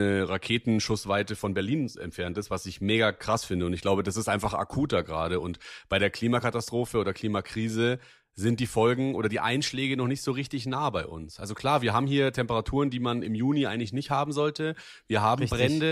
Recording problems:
abrupt cut into speech; at the start and the end

